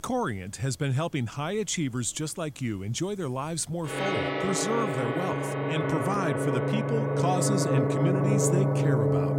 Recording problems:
background music; very loud; throughout; 3 dB above the speech

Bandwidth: 16 kHz